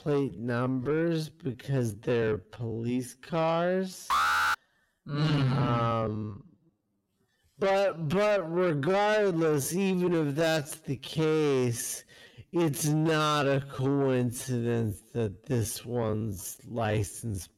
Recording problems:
wrong speed, natural pitch; too slow; 0.5 times normal speed
distortion; slight; 10 dB below the speech
alarm; loud; at 4 s; peak 4 dB above the speech

